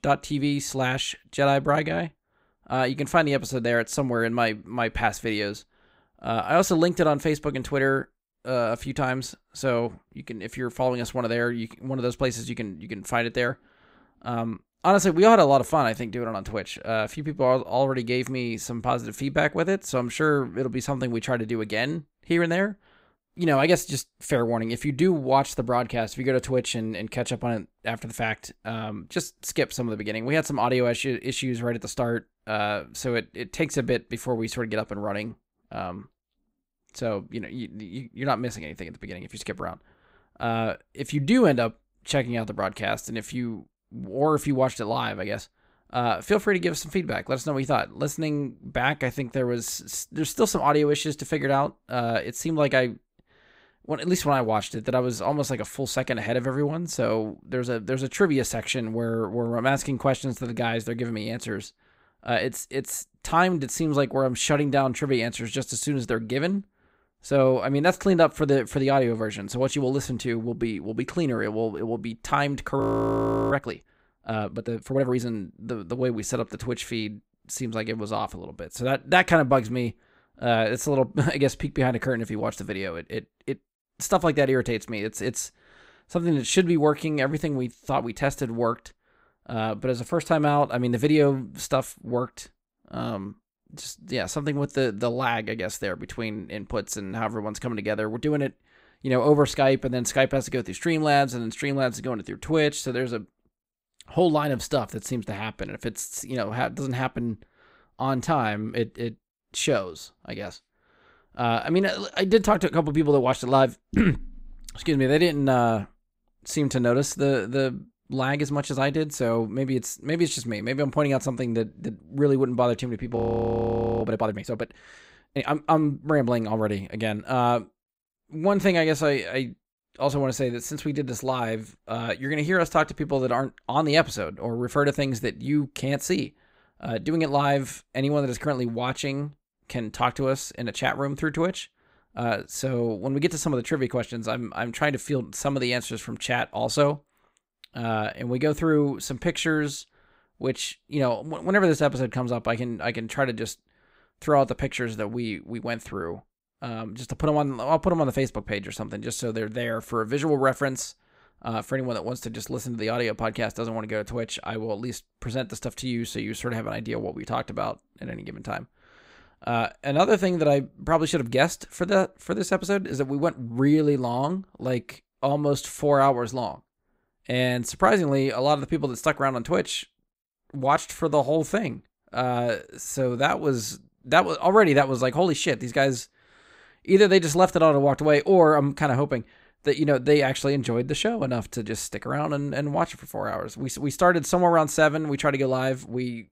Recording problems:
audio freezing; at 1:13 for 0.5 s and at 2:03 for 1 s

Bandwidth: 15.5 kHz